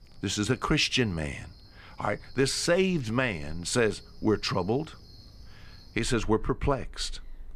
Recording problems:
animal sounds; faint; throughout; 20 dB below the speech

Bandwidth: 15 kHz